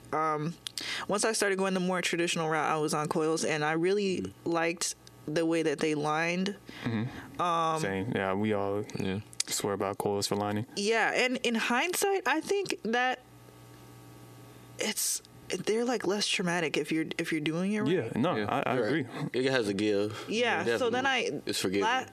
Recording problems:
squashed, flat; heavily

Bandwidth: 14 kHz